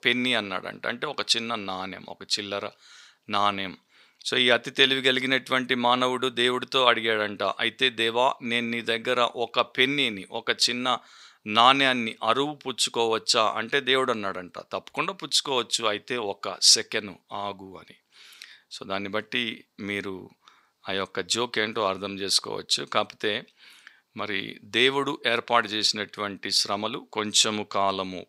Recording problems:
thin; somewhat; fading below 1 kHz

